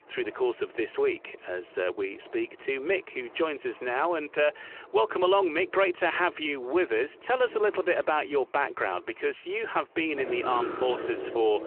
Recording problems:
phone-call audio
traffic noise; noticeable; throughout; 10 dB below the speech

